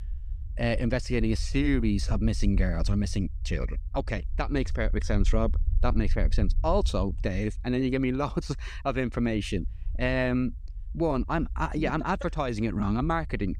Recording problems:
low rumble; faint; throughout; 25 dB below the speech

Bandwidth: 15 kHz